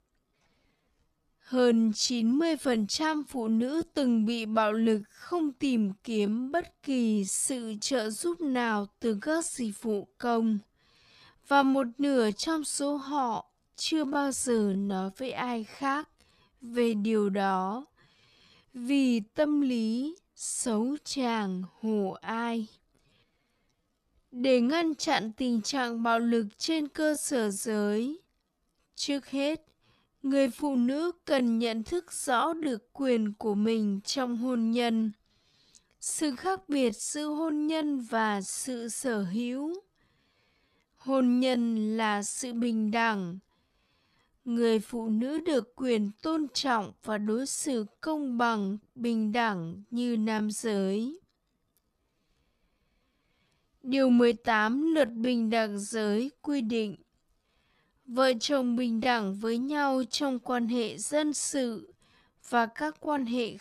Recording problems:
wrong speed, natural pitch; too slow; 0.5 times normal speed

